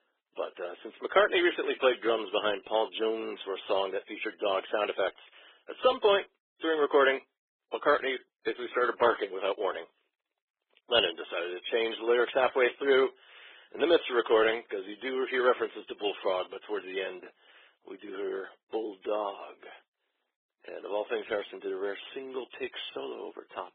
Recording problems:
garbled, watery; badly
phone-call audio; nothing above 3.5 kHz

